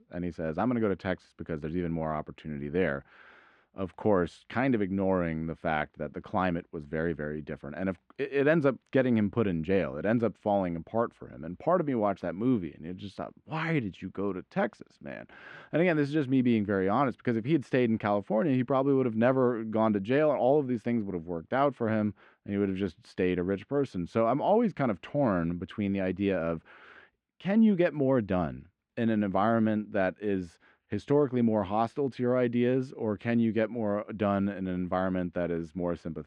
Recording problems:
muffled; very; fading above 2 kHz

